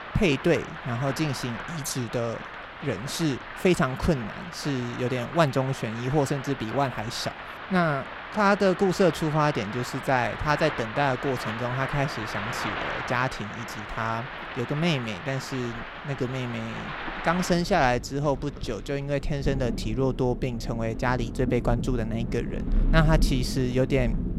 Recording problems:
rain or running water; loud; throughout; 8 dB below the speech

